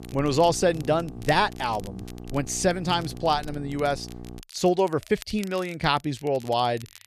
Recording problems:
electrical hum; faint; until 4.5 s; 60 Hz, 20 dB below the speech
crackle, like an old record; faint; 25 dB below the speech

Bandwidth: 13.5 kHz